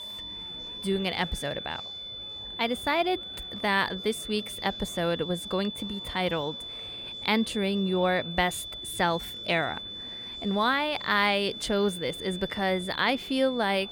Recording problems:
high-pitched whine; loud; throughout; 3.5 kHz, 8 dB below the speech
murmuring crowd; faint; throughout; 25 dB below the speech

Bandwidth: 18 kHz